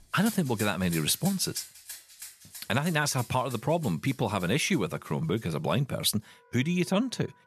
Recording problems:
background music; noticeable; throughout; 15 dB below the speech

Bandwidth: 13.5 kHz